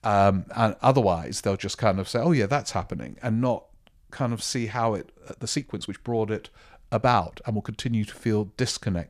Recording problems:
uneven, jittery; strongly; from 1 to 8 s

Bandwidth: 14.5 kHz